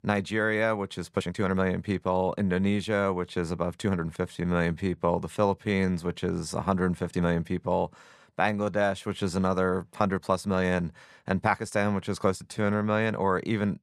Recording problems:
uneven, jittery; strongly; from 1 to 13 s

